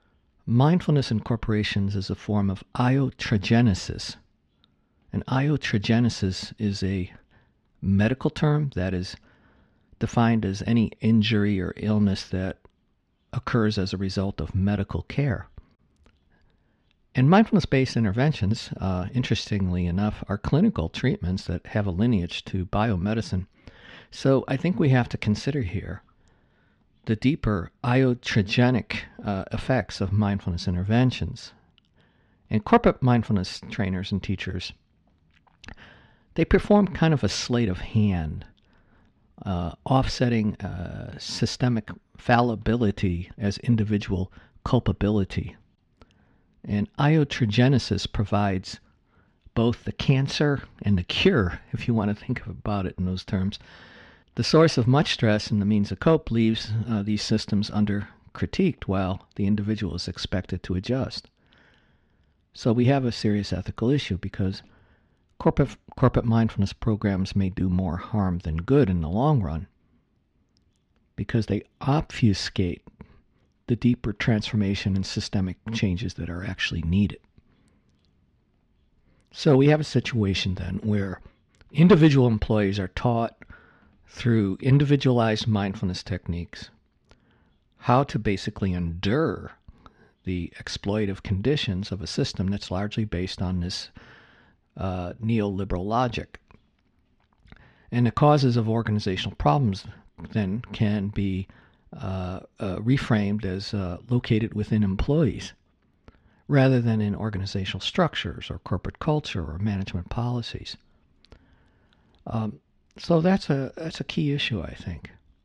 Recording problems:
muffled; slightly; fading above 3 kHz

